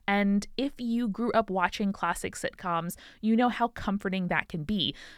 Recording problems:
none

